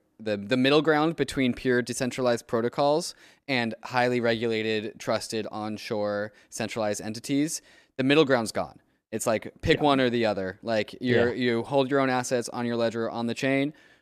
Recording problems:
none

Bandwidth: 14.5 kHz